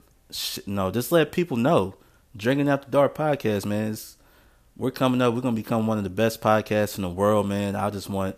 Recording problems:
none

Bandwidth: 14.5 kHz